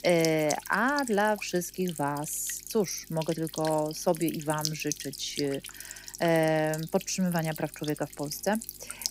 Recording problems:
electrical hum; noticeable; throughout; 50 Hz, 10 dB below the speech

